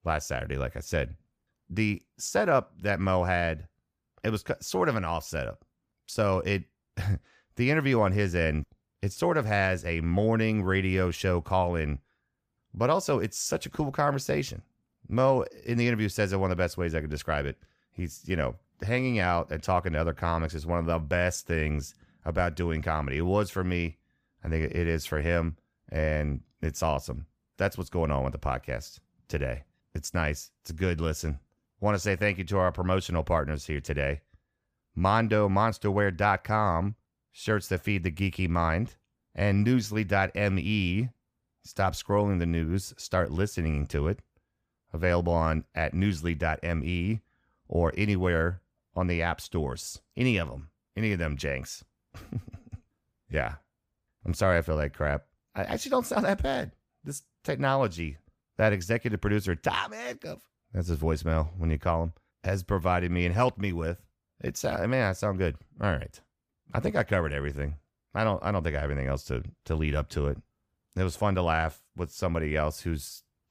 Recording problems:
none

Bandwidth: 15 kHz